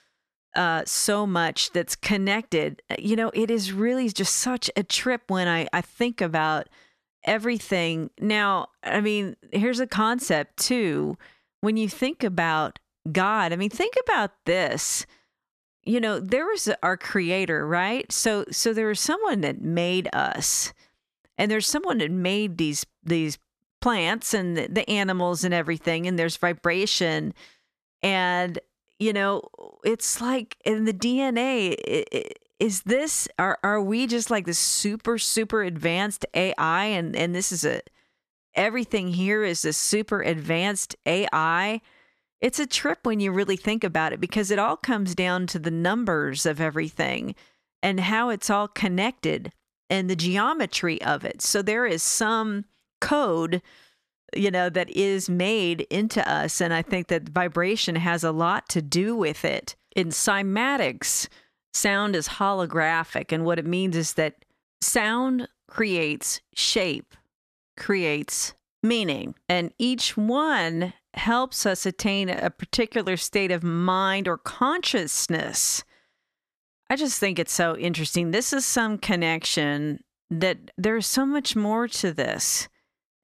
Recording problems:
none

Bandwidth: 14 kHz